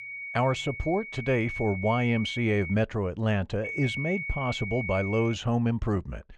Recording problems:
muffled; slightly; fading above 3.5 kHz
high-pitched whine; loud; until 2.5 s and from 3.5 to 5.5 s; 2 kHz, 7 dB below the speech

